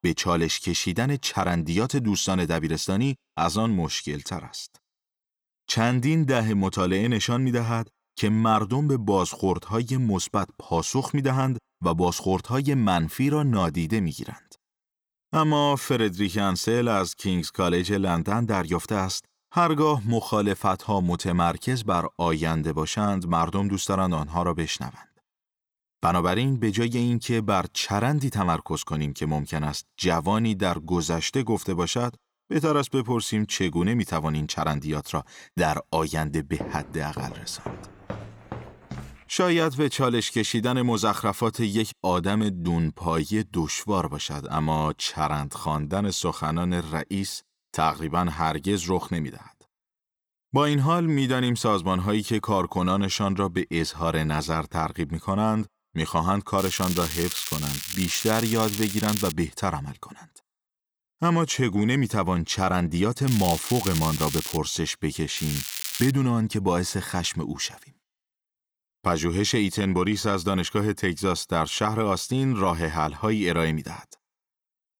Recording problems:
crackling; loud; from 57 to 59 s, from 1:03 to 1:05 and at 1:05; 5 dB below the speech
footsteps; faint; from 37 to 39 s; peak 10 dB below the speech

